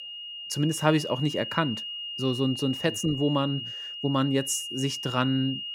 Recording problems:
high-pitched whine; loud; throughout; 3 kHz, 7 dB below the speech

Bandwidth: 17 kHz